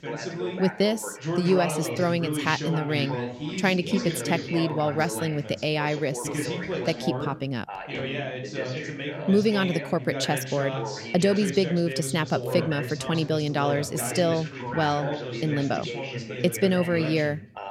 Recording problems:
background chatter; loud; throughout; 2 voices, 6 dB below the speech

